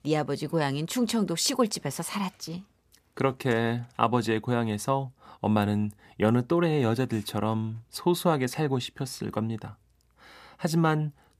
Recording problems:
none

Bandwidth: 14.5 kHz